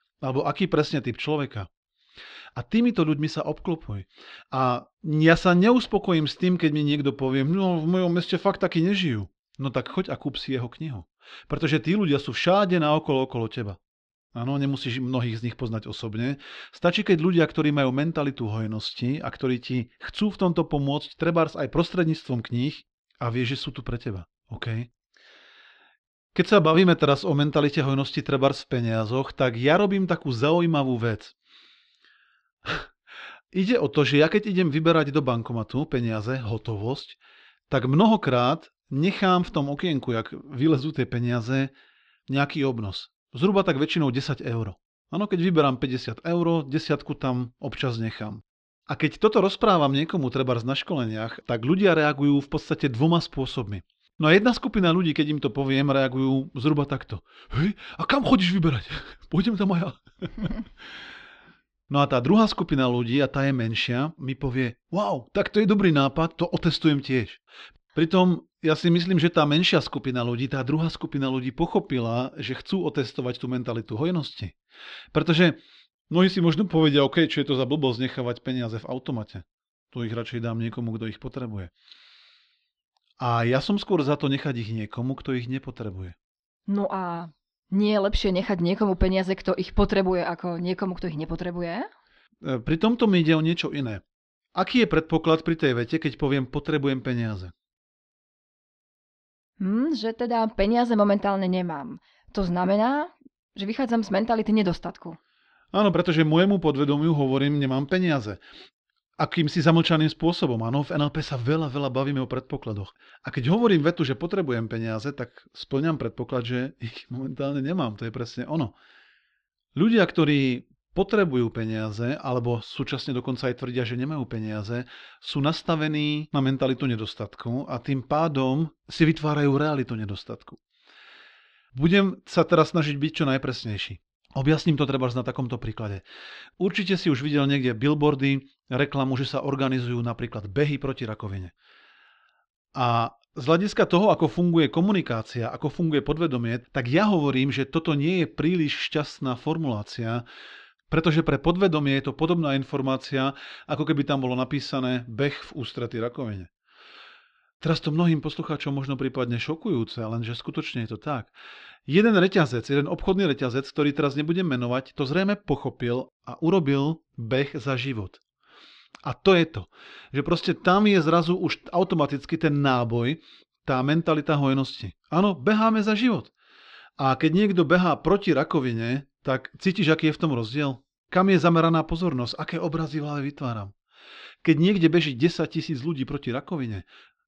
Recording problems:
muffled; very slightly; fading above 4 kHz

